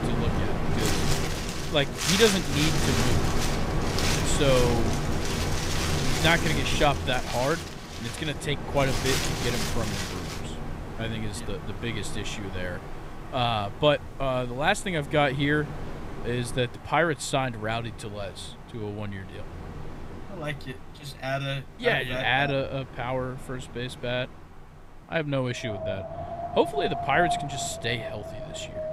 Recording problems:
wind in the background; loud; throughout; 2 dB below the speech

